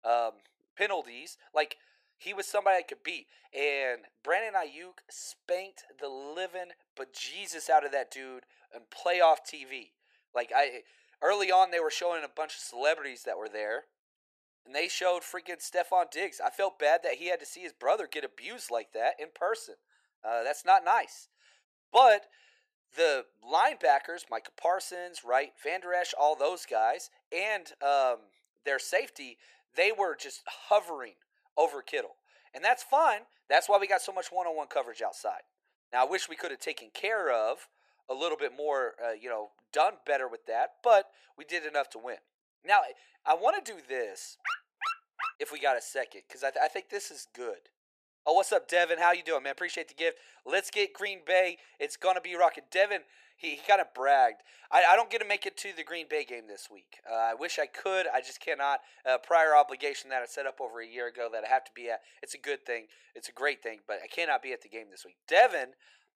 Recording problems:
thin; very; fading below 450 Hz
dog barking; noticeable; at 44 s; peak 5 dB below the speech

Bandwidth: 14.5 kHz